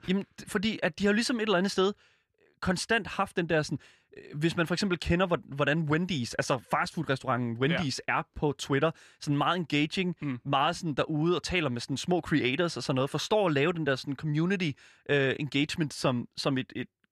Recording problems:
none

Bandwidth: 14.5 kHz